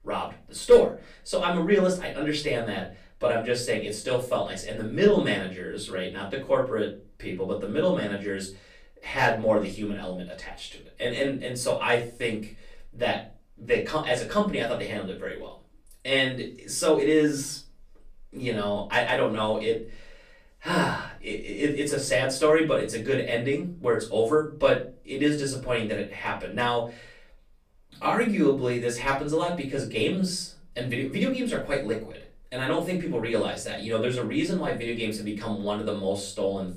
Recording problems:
off-mic speech; far
room echo; slight; dies away in 0.3 s

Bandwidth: 15 kHz